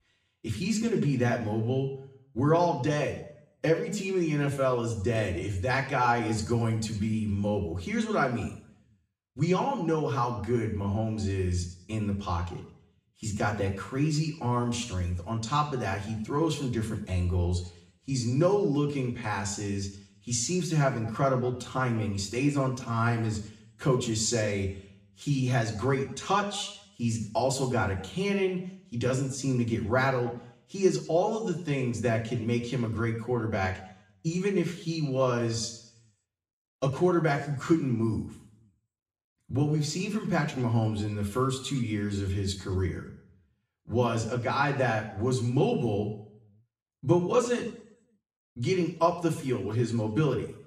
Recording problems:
room echo; slight; dies away in 0.6 s
off-mic speech; somewhat distant

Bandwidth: 15 kHz